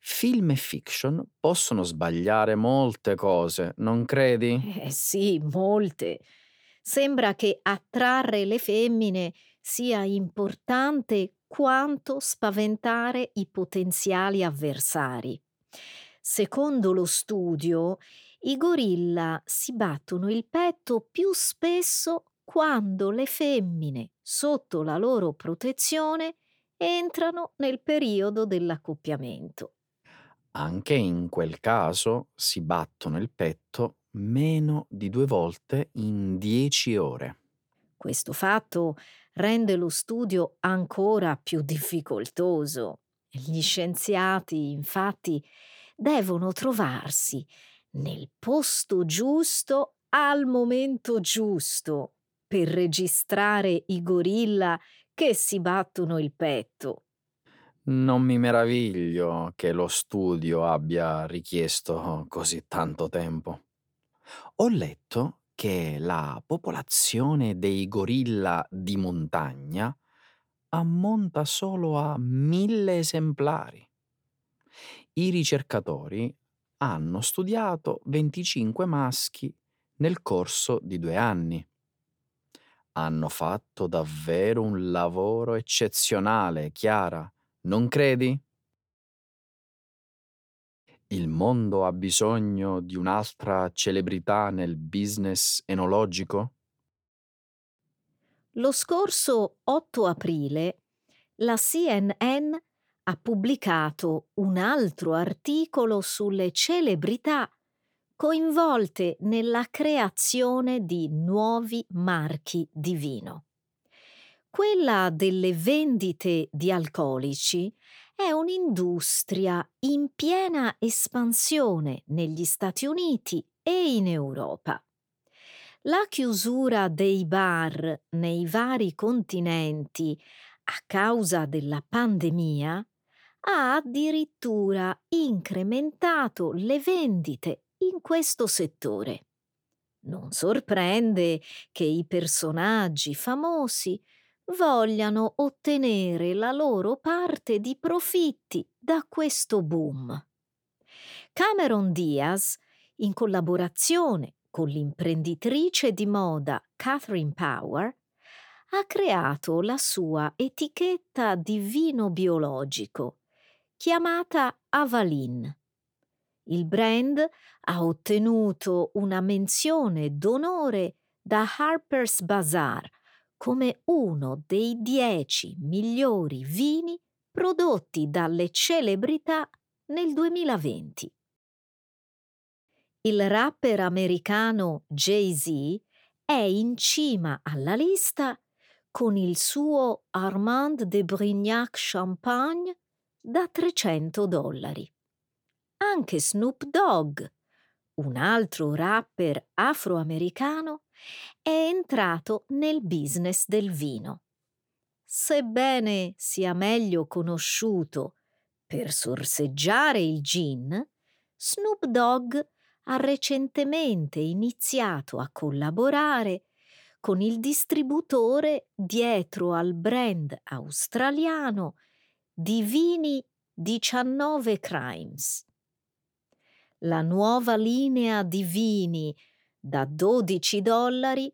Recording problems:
none

